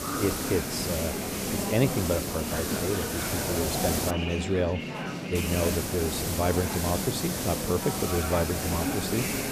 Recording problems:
murmuring crowd; loud; throughout; 4 dB below the speech
hiss; loud; until 4 s and from 5.5 s on; 1 dB below the speech

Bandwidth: 14.5 kHz